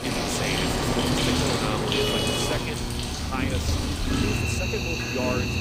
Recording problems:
animal sounds; very loud; throughout; 5 dB above the speech
traffic noise; very loud; throughout; 4 dB above the speech
electrical hum; loud; from 0.5 to 3 s and from 4 s on; 60 Hz, 8 dB below the speech

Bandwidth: 15.5 kHz